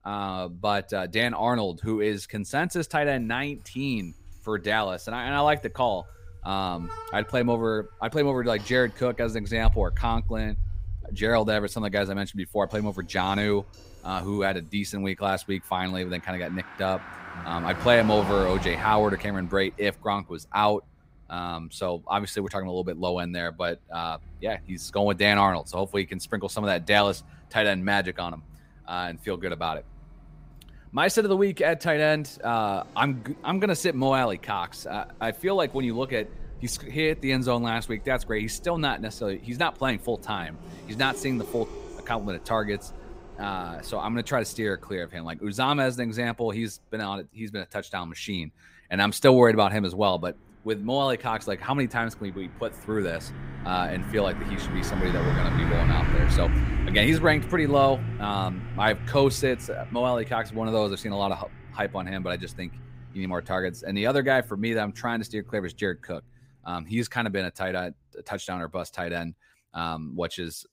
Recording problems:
traffic noise; loud; throughout; 8 dB below the speech

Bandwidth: 15.5 kHz